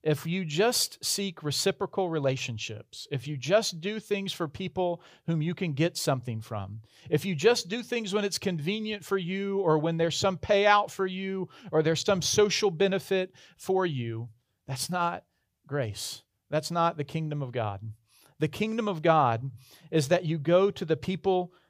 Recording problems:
none

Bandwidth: 15 kHz